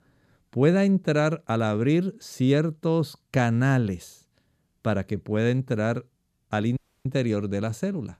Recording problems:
audio cutting out; at 7 s

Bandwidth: 14.5 kHz